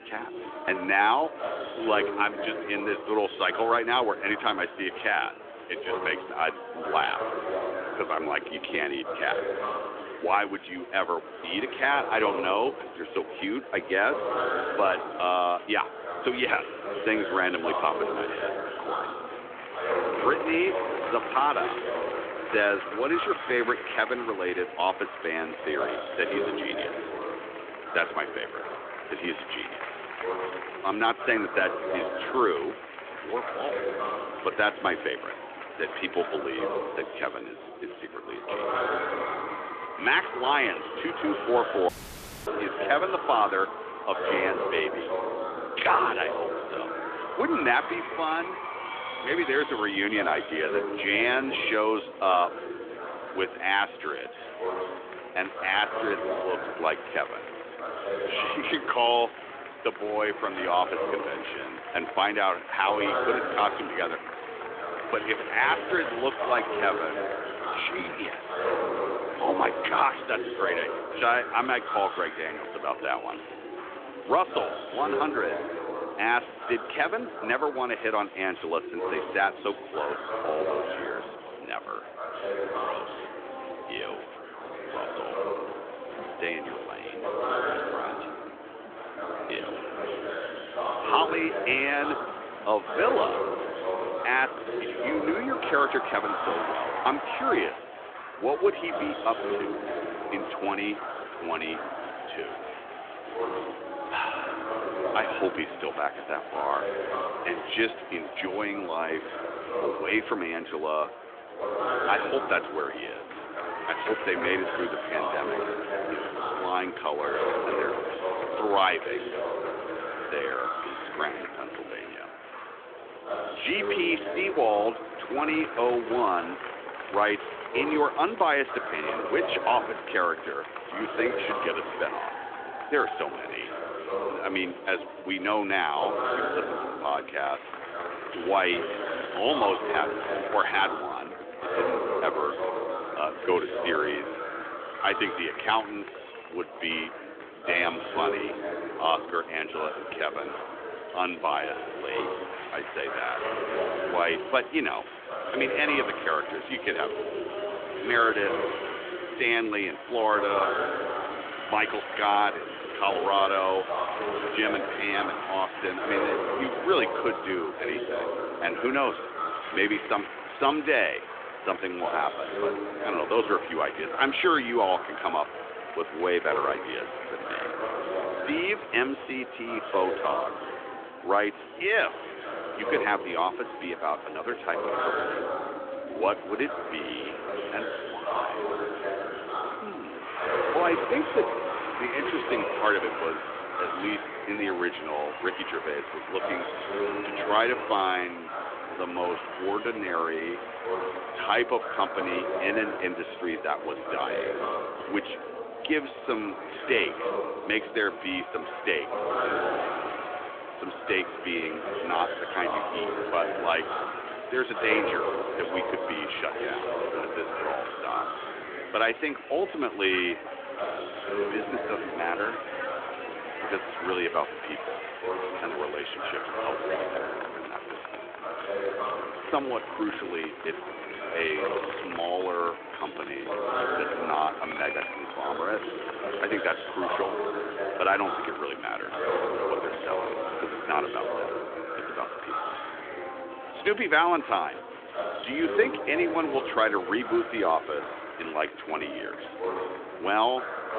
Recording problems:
phone-call audio; nothing above 3.5 kHz
chatter from many people; loud; throughout; 5 dB below the speech
traffic noise; noticeable; throughout; 20 dB below the speech
audio cutting out; at 42 s for 0.5 s

